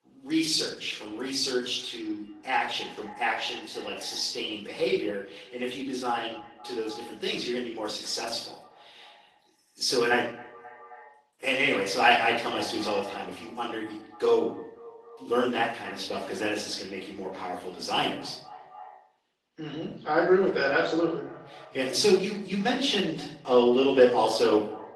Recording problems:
off-mic speech; far
thin; somewhat; fading below 300 Hz
echo of what is said; faint; throughout; 260 ms later, 20 dB below the speech
room echo; slight; dies away in 0.6 s
garbled, watery; slightly

